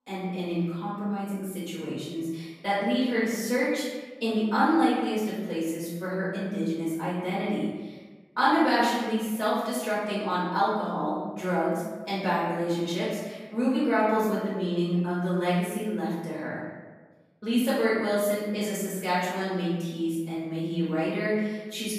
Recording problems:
room echo; strong; dies away in 1.1 s
off-mic speech; far

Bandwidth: 14.5 kHz